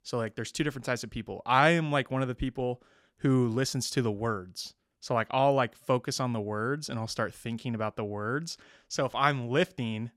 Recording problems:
none

